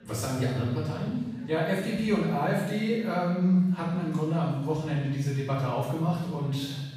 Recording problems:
room echo; strong; dies away in 1.1 s
off-mic speech; far
background chatter; faint; throughout; 3 voices, 25 dB below the speech

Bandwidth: 15 kHz